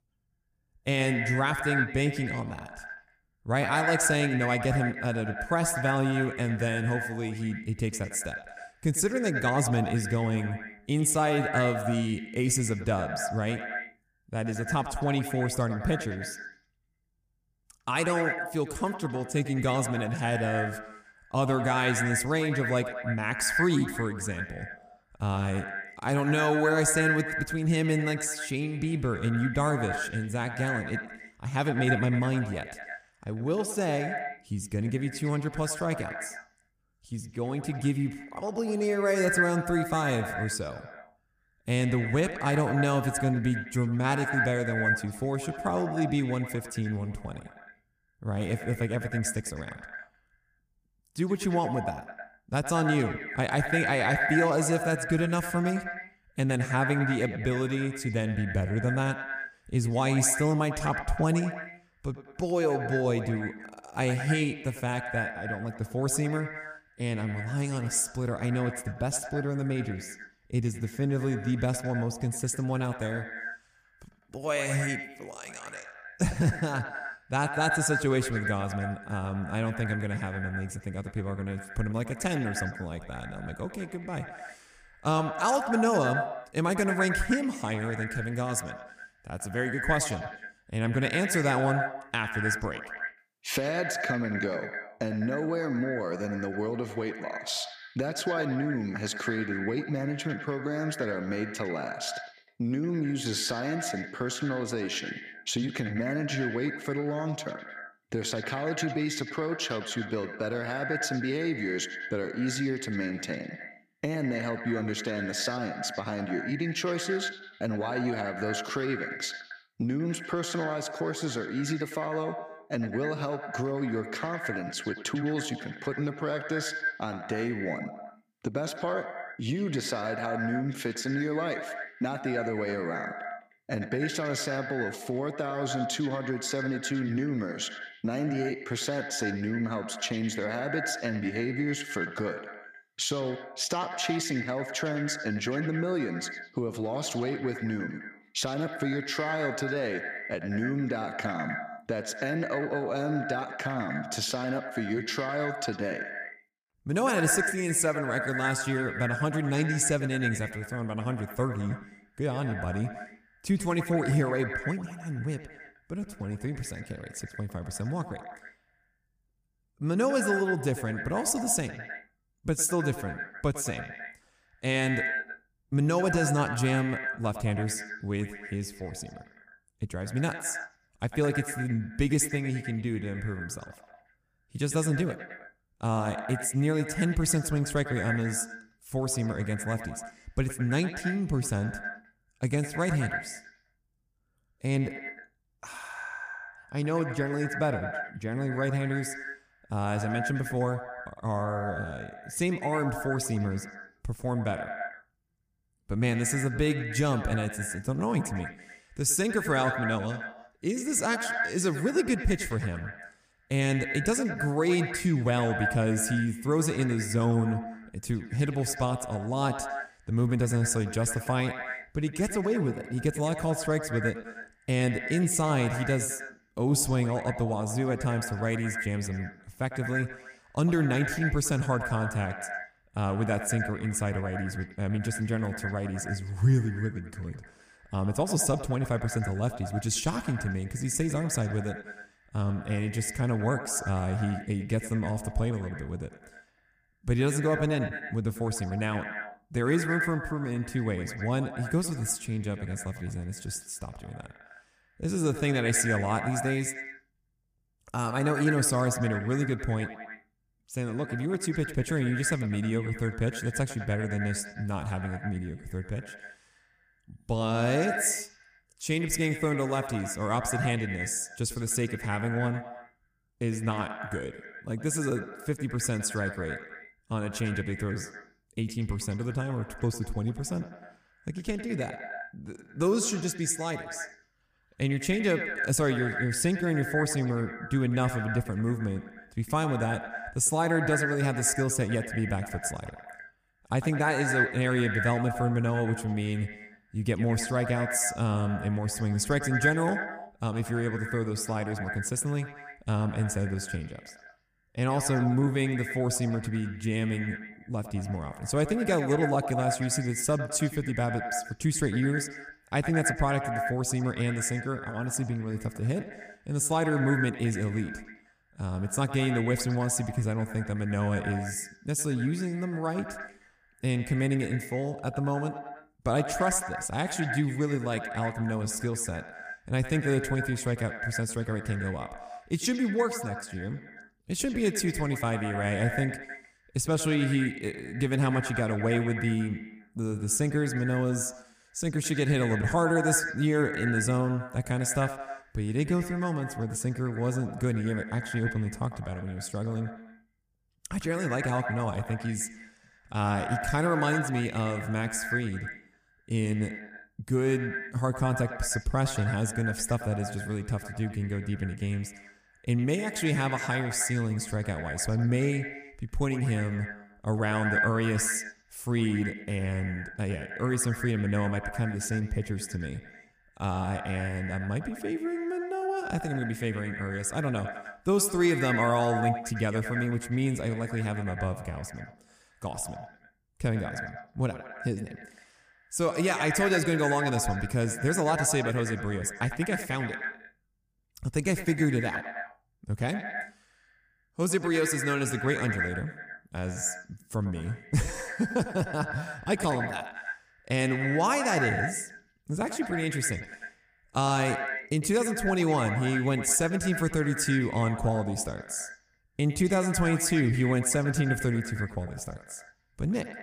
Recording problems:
echo of what is said; strong; throughout; 100 ms later, 7 dB below the speech

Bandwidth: 15 kHz